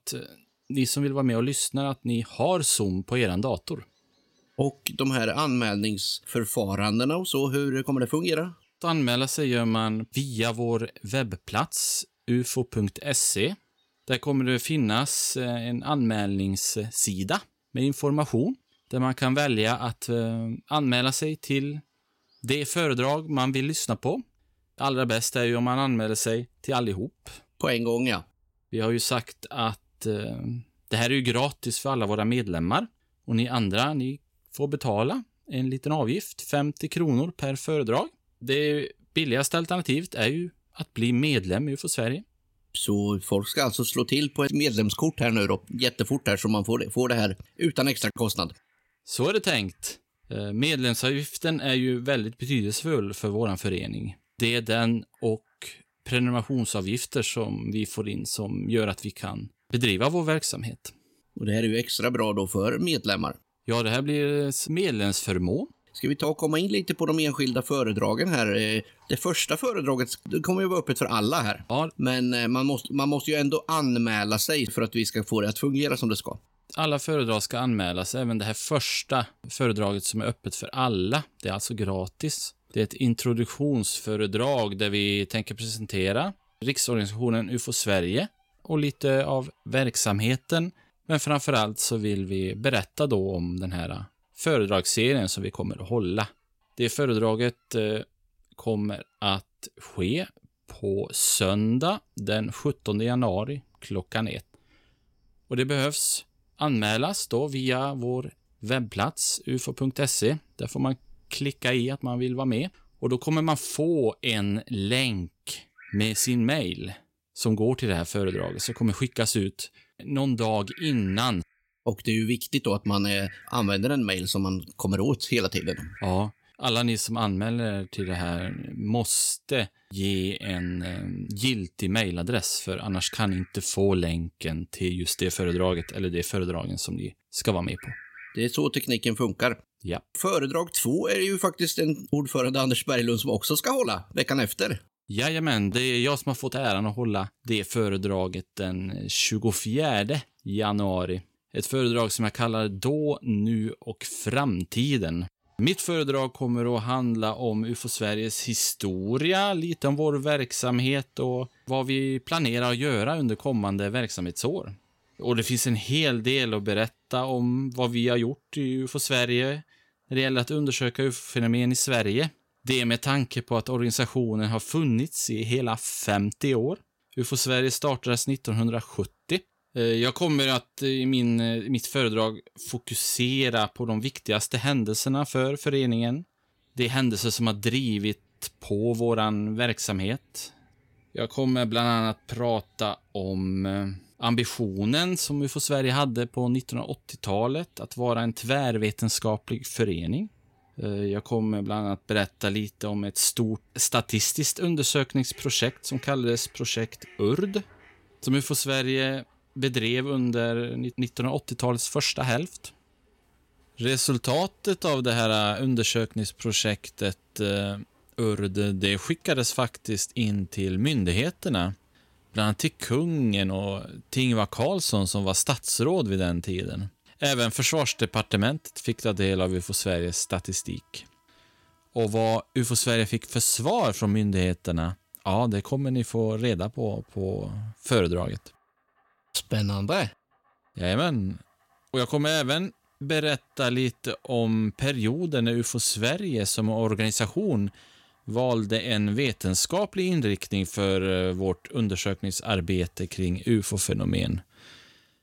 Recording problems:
animal sounds; faint; throughout; 30 dB below the speech

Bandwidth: 16.5 kHz